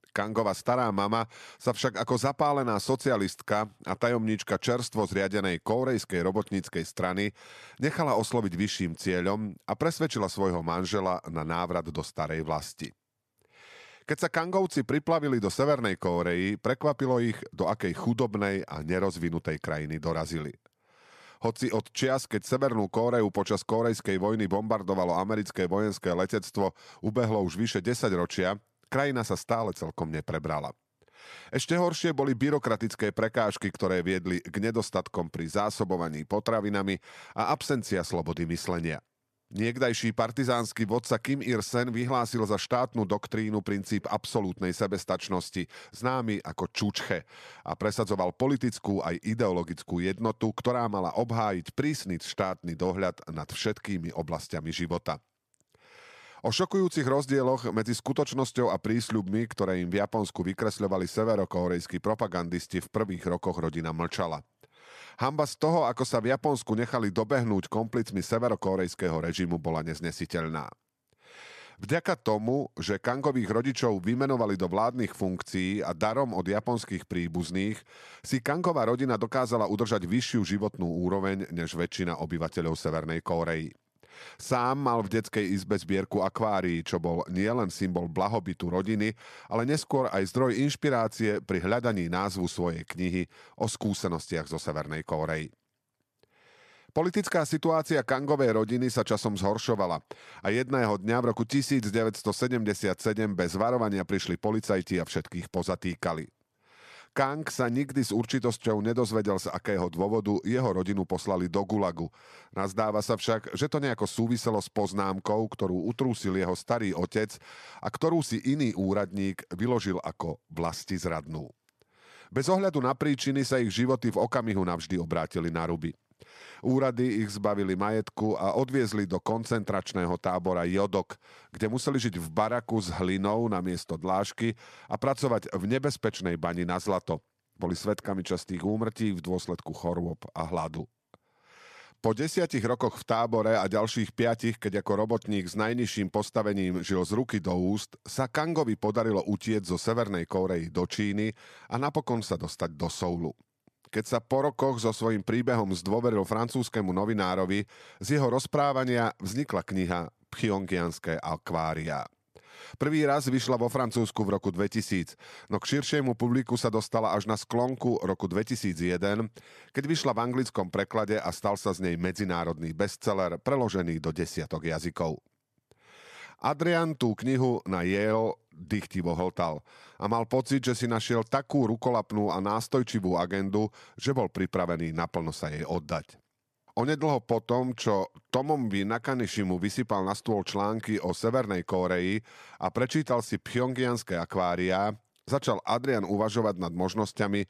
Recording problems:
none

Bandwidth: 14 kHz